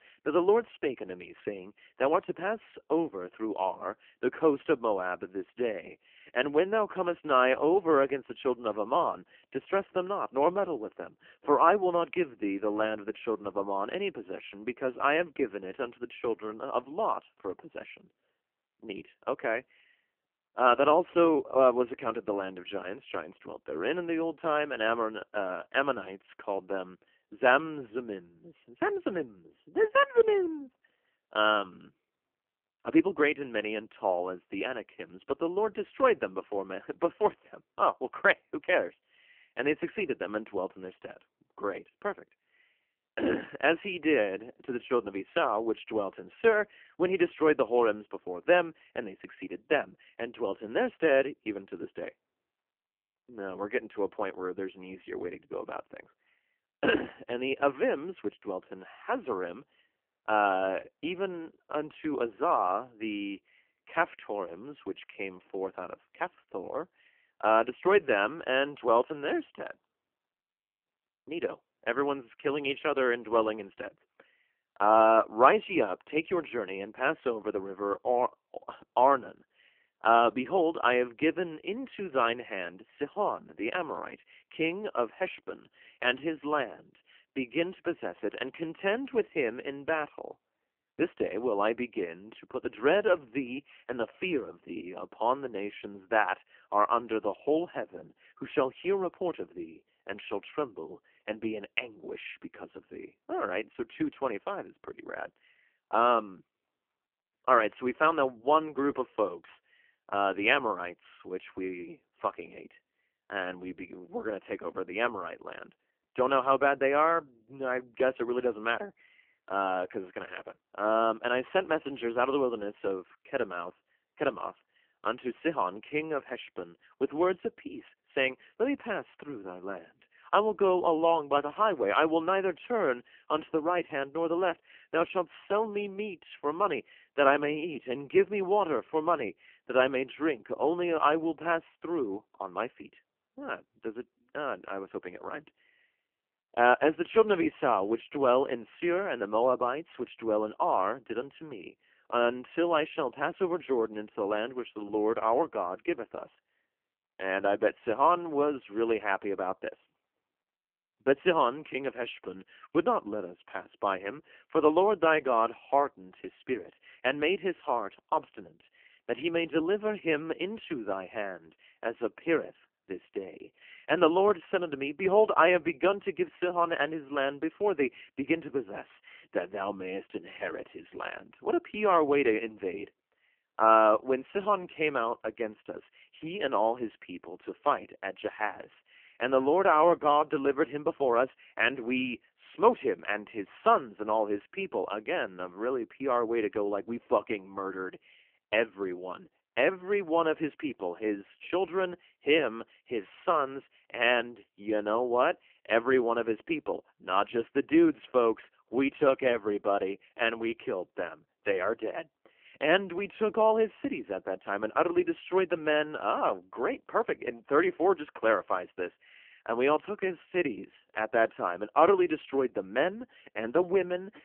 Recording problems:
phone-call audio; poor line; nothing above 3 kHz

